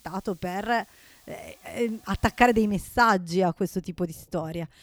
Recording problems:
hiss; faint; until 2.5 s; 30 dB below the speech

